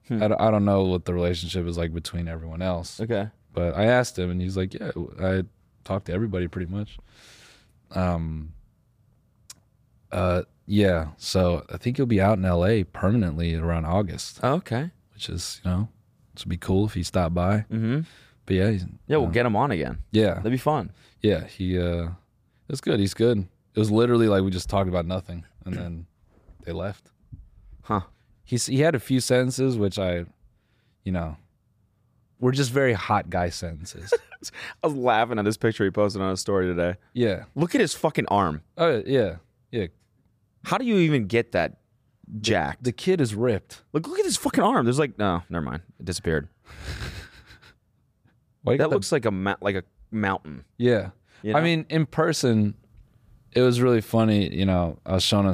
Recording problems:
abrupt cut into speech; at the end

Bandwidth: 15 kHz